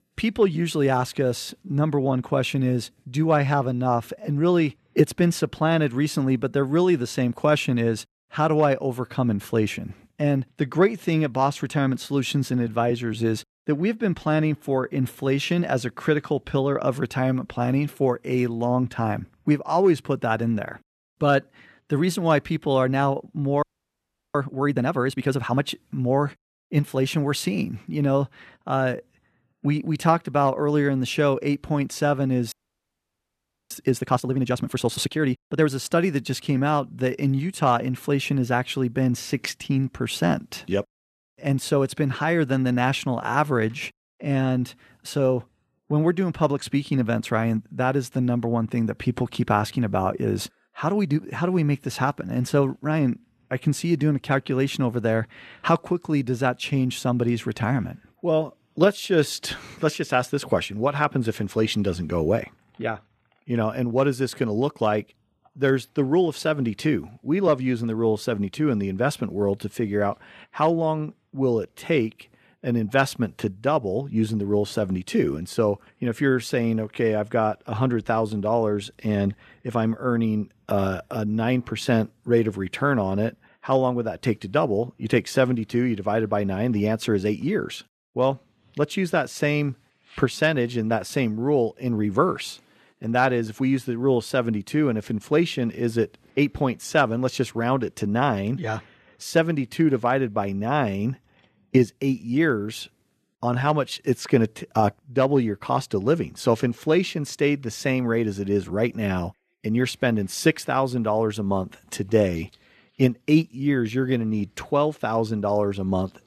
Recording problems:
audio freezing; at 24 s for 0.5 s and at 33 s for 1 s

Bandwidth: 13.5 kHz